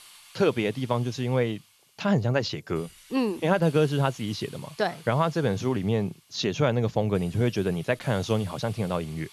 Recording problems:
high frequencies cut off; noticeable; nothing above 7.5 kHz
hiss; faint; throughout; 20 dB below the speech

